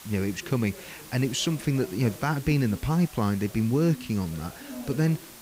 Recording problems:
background chatter; noticeable; throughout; 3 voices, 20 dB below the speech
hiss; noticeable; throughout; 20 dB below the speech

